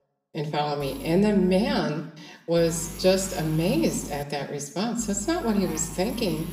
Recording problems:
room echo; slight; dies away in 0.6 s
off-mic speech; somewhat distant
electrical hum; noticeable; from 1 to 2 s, from 2.5 to 4 s and from 5 s on; 50 Hz, 15 dB below the speech

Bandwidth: 15.5 kHz